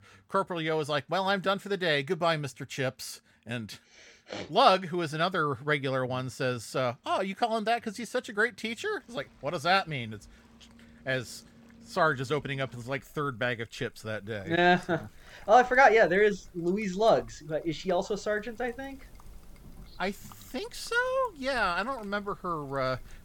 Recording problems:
rain or running water; faint; throughout; 25 dB below the speech

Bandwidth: 17.5 kHz